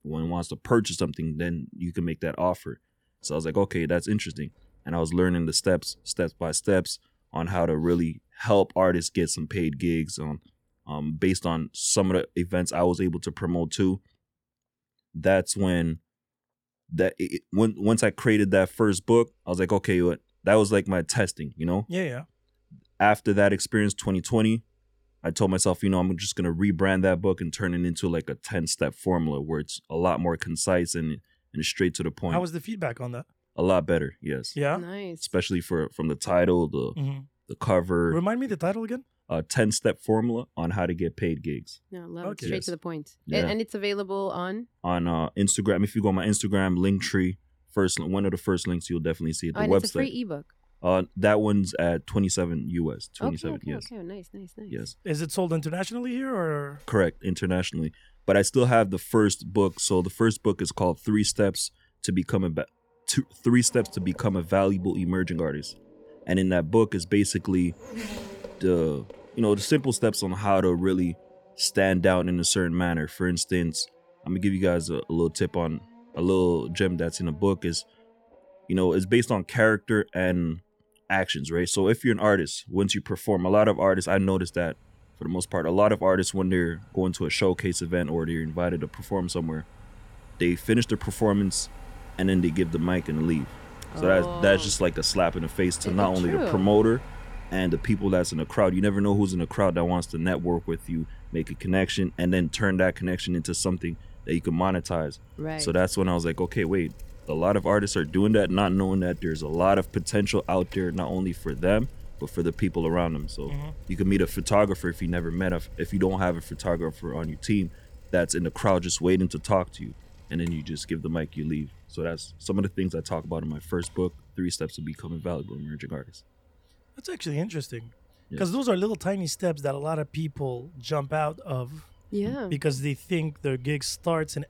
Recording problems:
traffic noise; faint; throughout; 20 dB below the speech

